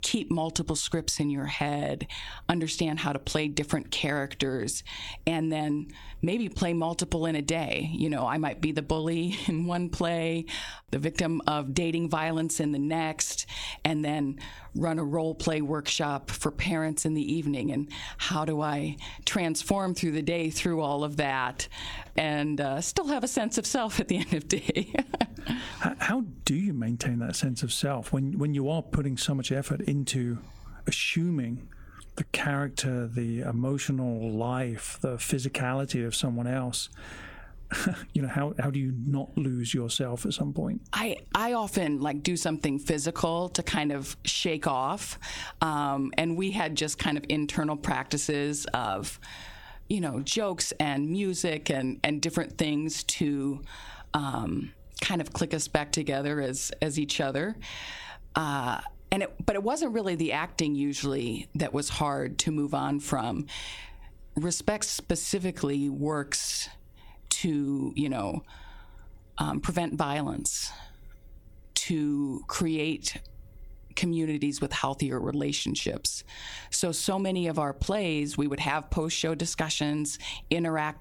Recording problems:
squashed, flat; heavily

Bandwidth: 18 kHz